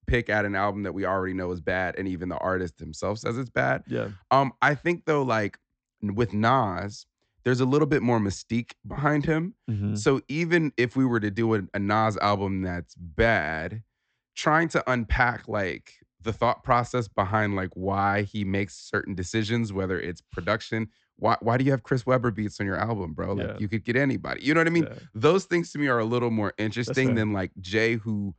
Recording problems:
high frequencies cut off; noticeable; nothing above 8 kHz

